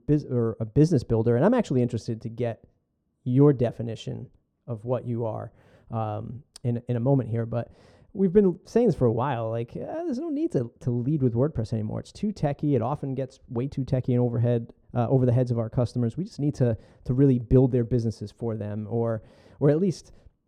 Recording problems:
muffled; very; fading above 1 kHz

